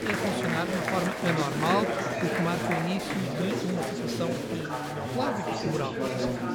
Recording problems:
chatter from many people; very loud; throughout; 2 dB above the speech

